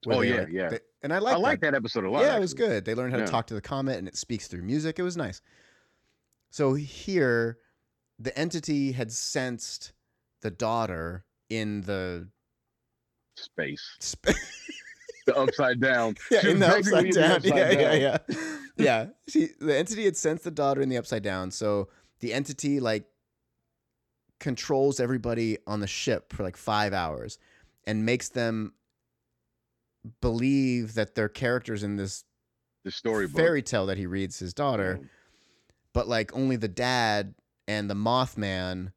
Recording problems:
none

